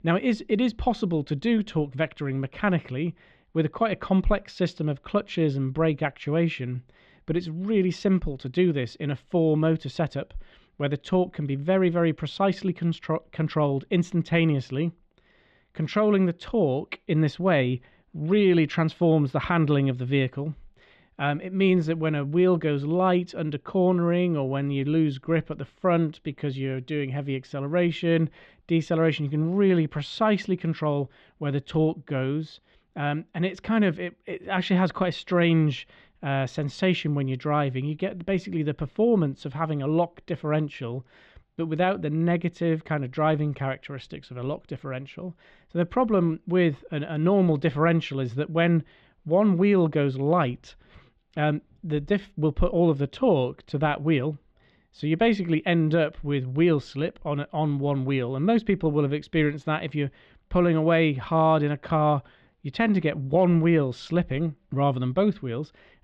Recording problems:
muffled; slightly; fading above 3.5 kHz

